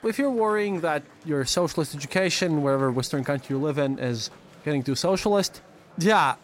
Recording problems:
murmuring crowd; faint; throughout; 25 dB below the speech

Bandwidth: 16 kHz